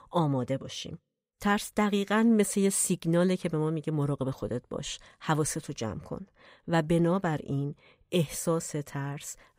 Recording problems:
none

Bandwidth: 15.5 kHz